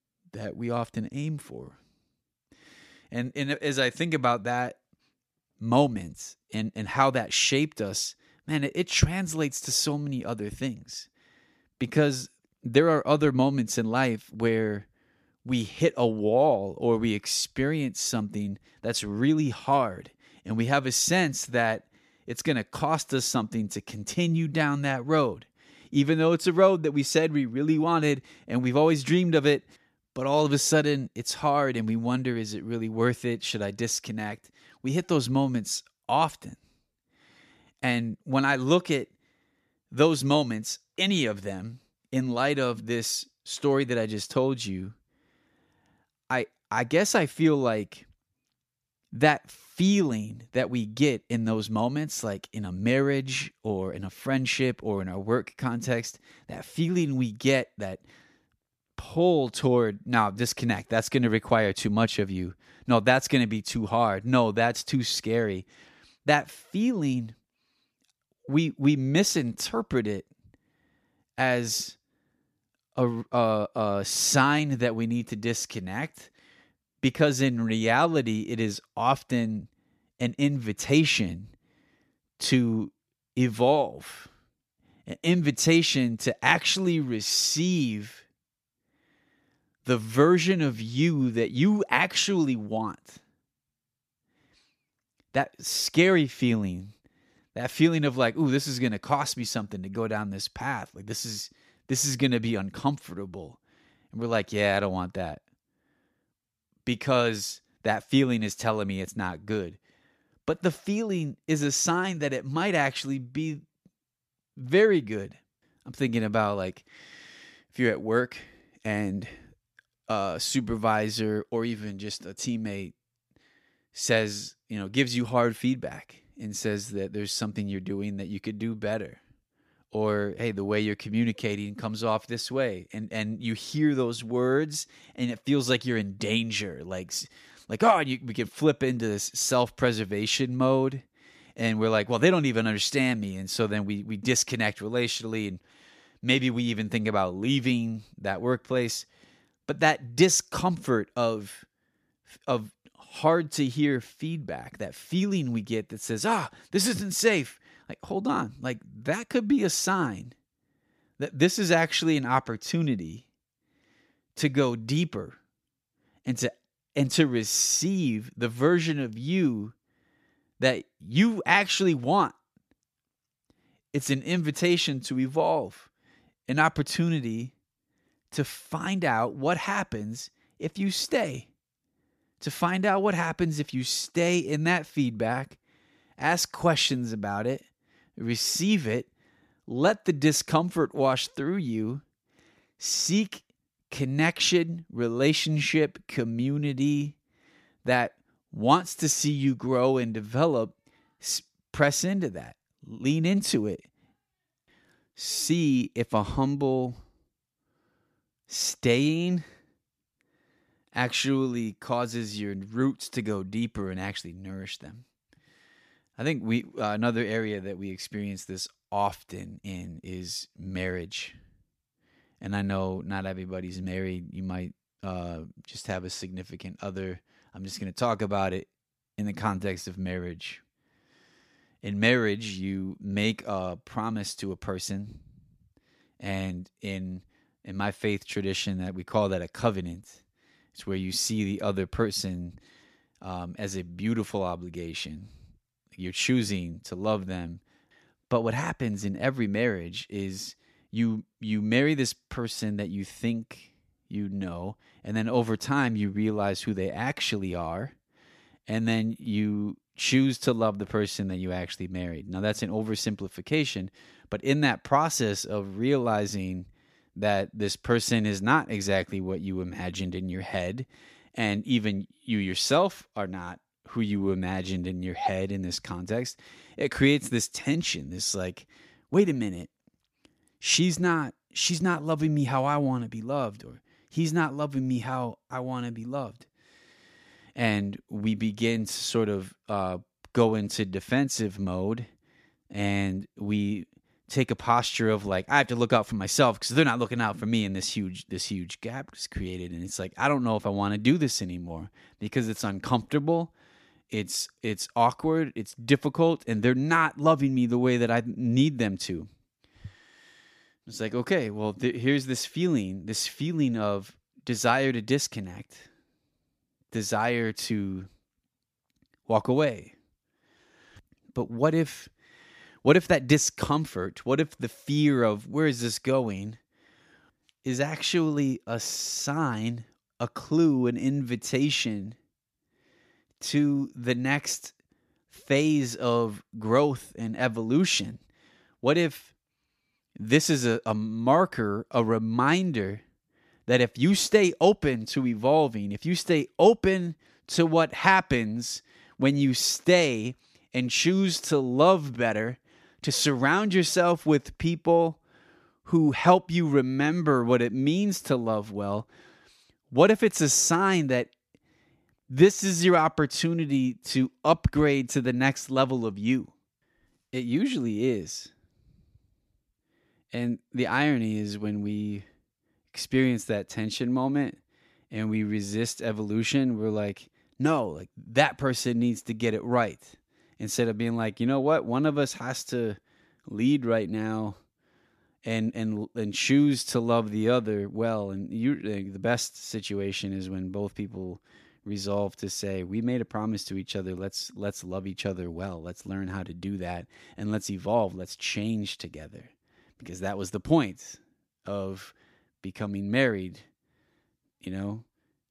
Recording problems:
none

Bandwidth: 14.5 kHz